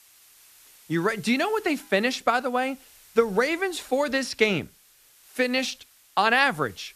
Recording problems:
hiss; faint; throughout; 25 dB below the speech

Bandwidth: 14.5 kHz